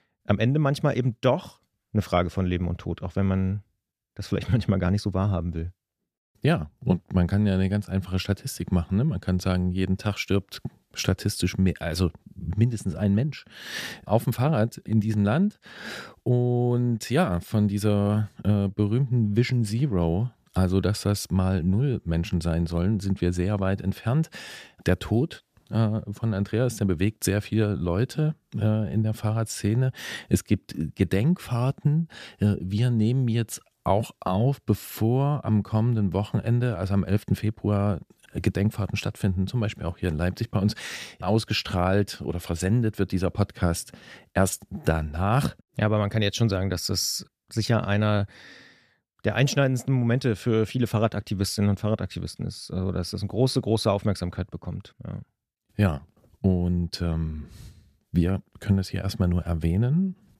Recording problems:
none

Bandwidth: 14.5 kHz